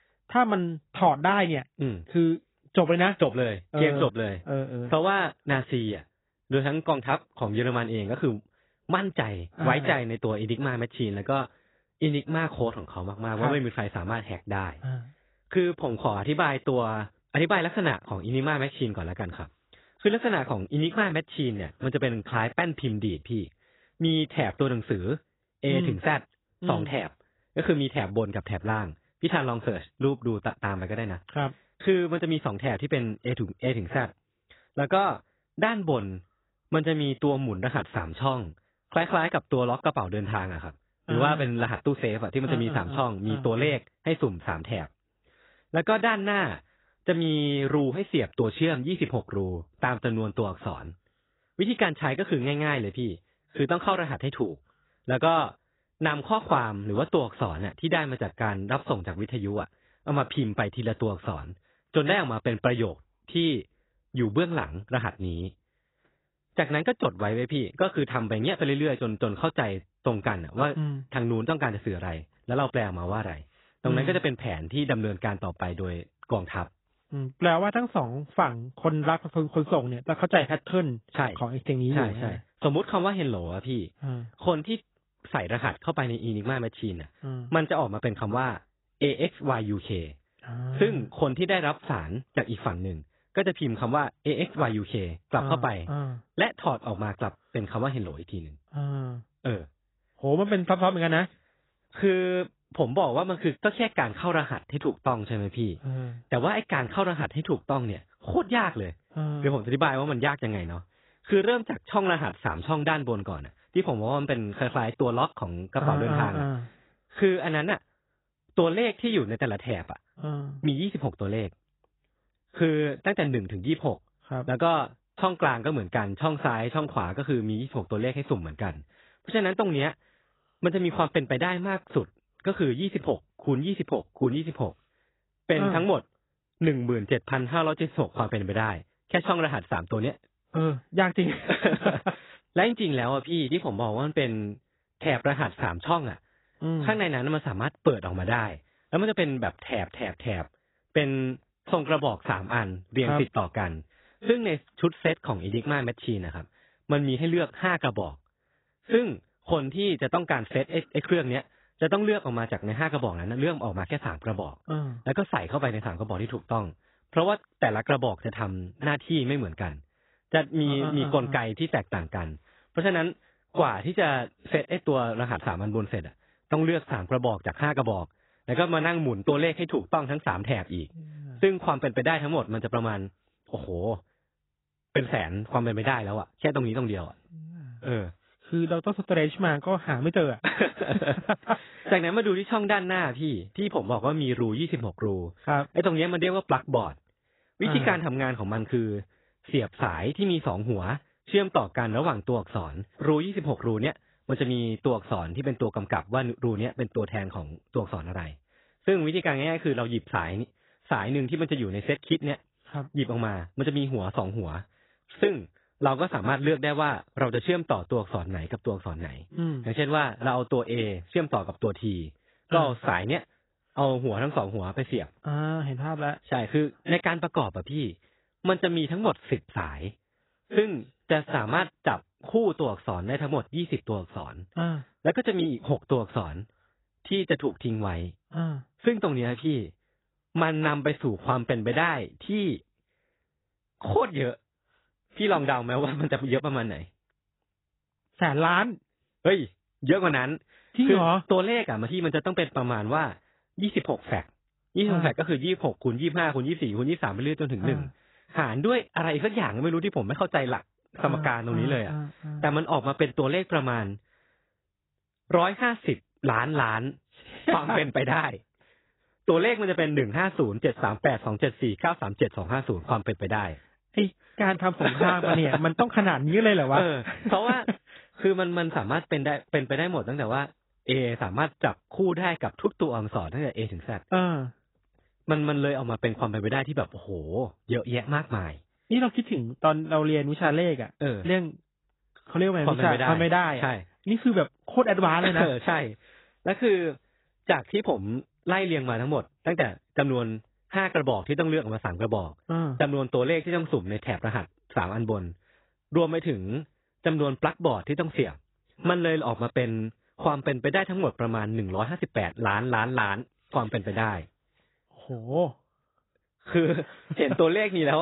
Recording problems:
garbled, watery; badly; nothing above 4 kHz
abrupt cut into speech; at the end

